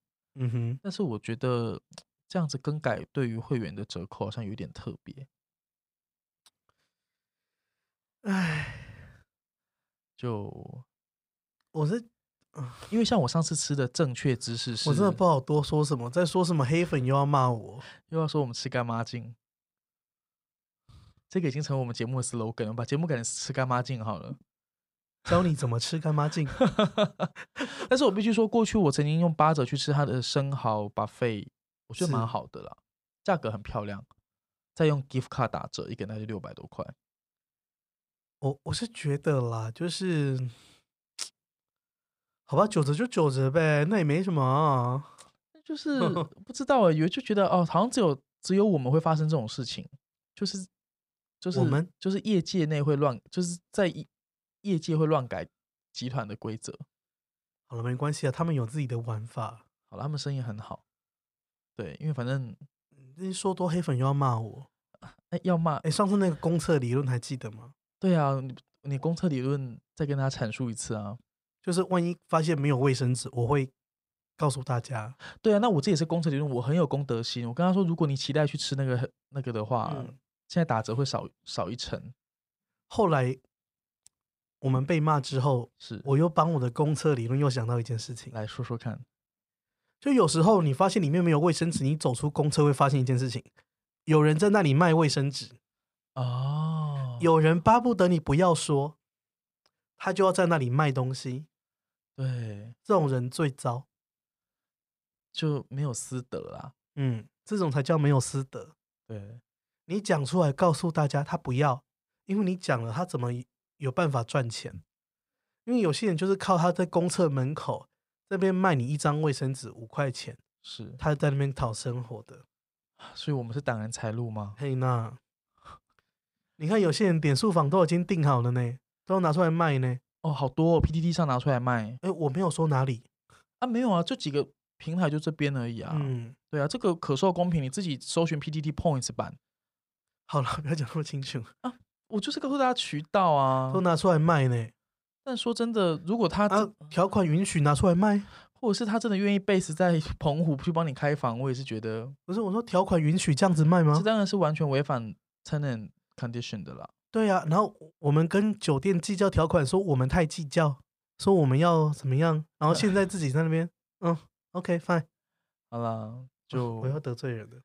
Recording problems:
none

